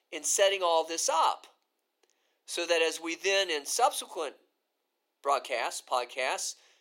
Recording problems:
thin; very; fading below 400 Hz

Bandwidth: 16 kHz